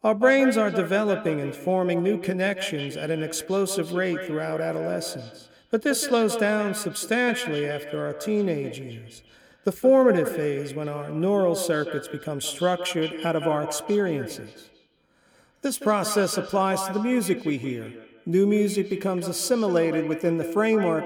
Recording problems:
echo of what is said; strong; throughout; 170 ms later, 9 dB below the speech

